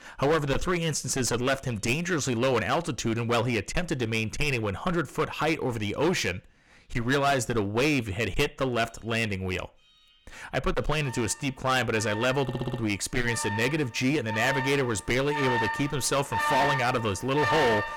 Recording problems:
distortion; heavy; 12% of the sound clipped
alarms or sirens; loud; throughout; 4 dB below the speech
audio stuttering; at 12 s

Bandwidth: 17 kHz